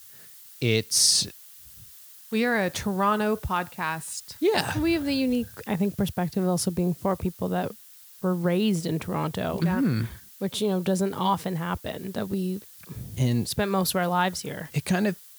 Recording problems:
hiss; noticeable; throughout; 20 dB below the speech

